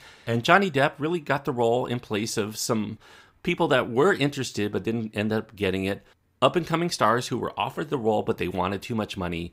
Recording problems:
none

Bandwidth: 15.5 kHz